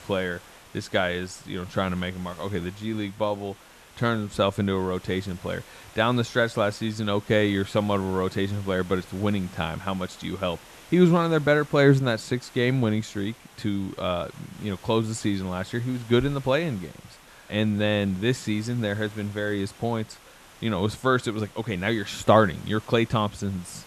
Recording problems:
hiss; faint; throughout; 20 dB below the speech

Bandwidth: 13.5 kHz